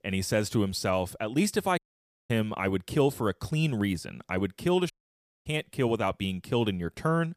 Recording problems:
audio cutting out; at 2 s for 0.5 s and at 5 s for 0.5 s

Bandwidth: 15 kHz